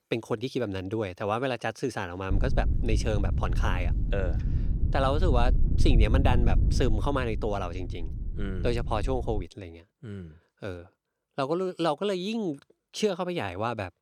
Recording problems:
wind noise on the microphone; occasional gusts; from 2.5 to 9.5 s; 15 dB below the speech

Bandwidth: 18.5 kHz